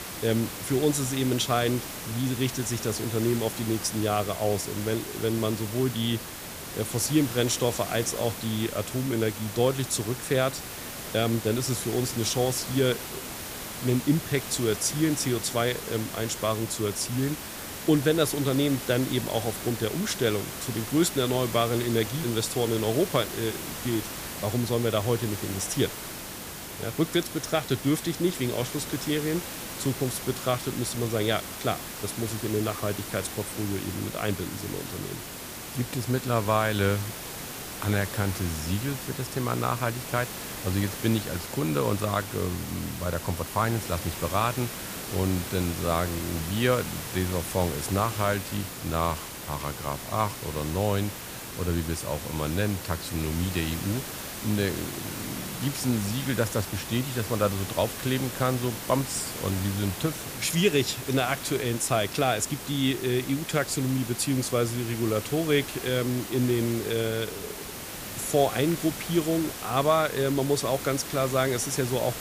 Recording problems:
hiss; loud; throughout; 7 dB below the speech

